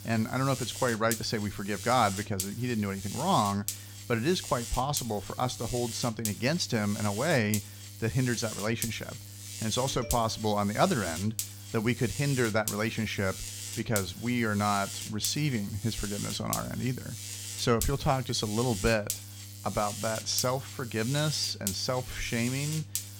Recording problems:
electrical hum; loud; throughout; 50 Hz, 9 dB below the speech

